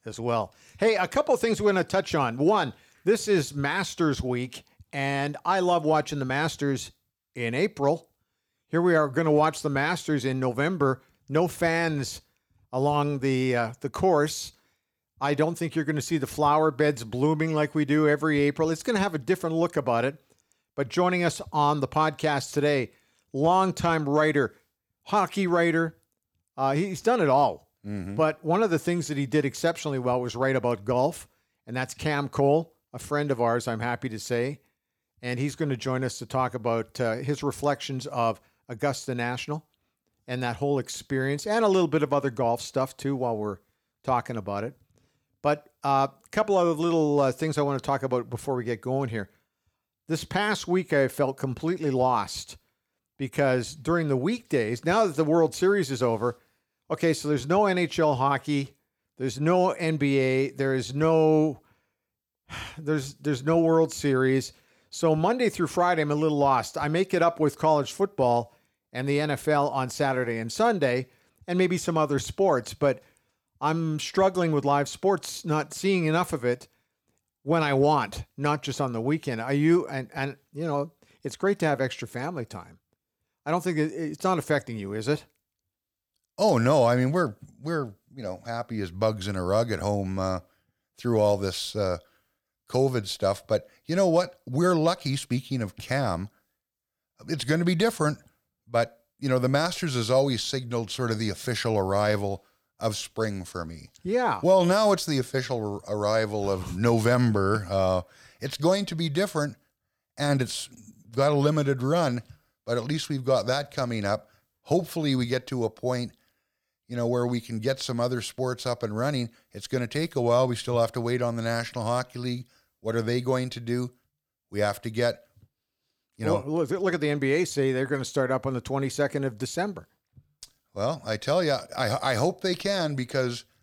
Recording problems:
none

